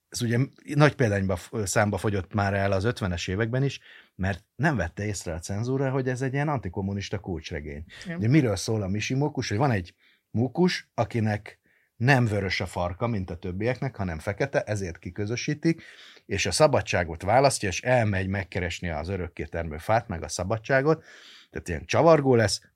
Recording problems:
none

